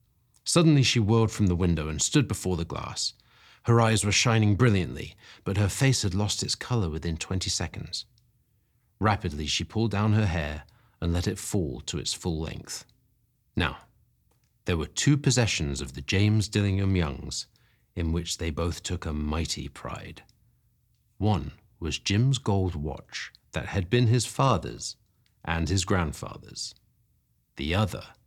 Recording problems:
none

